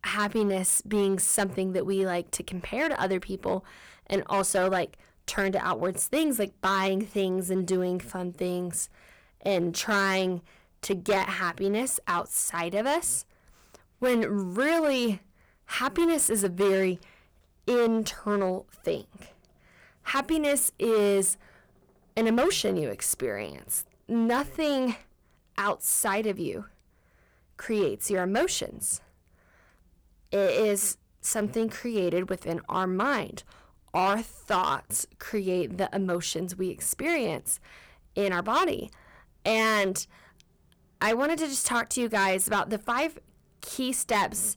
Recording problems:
distortion; slight; 6% of the sound clipped

